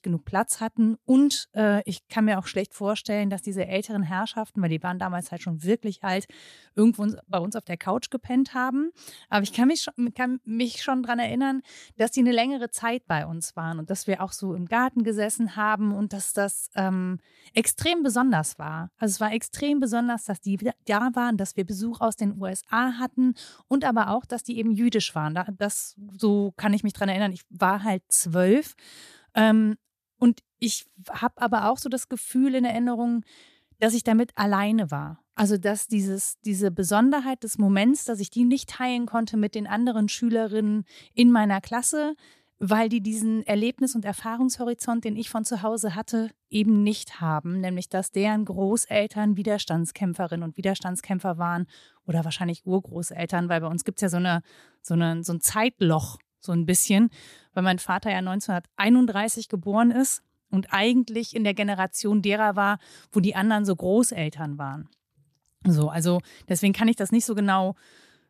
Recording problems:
none

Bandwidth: 14.5 kHz